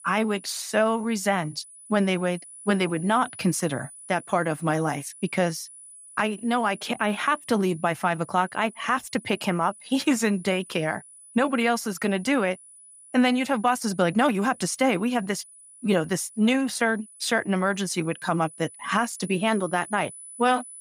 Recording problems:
high-pitched whine; noticeable; throughout; 10 kHz, 20 dB below the speech

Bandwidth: 15.5 kHz